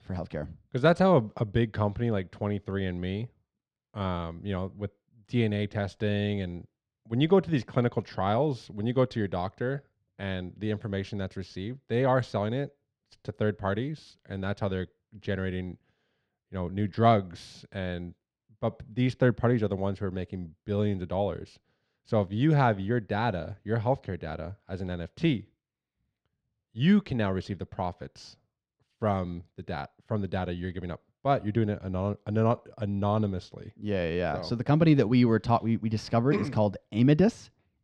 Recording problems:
muffled; slightly; fading above 3 kHz

